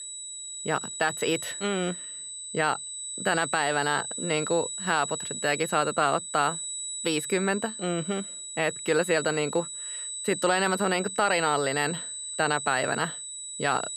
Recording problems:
high-pitched whine; loud; throughout; 8 kHz, 6 dB below the speech

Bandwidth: 15 kHz